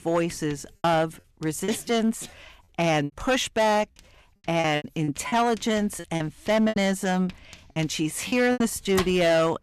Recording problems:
distortion; slight; 7% of the sound clipped
household noises; noticeable; throughout; 15 dB below the speech
choppy; very; 9% of the speech affected

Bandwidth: 13.5 kHz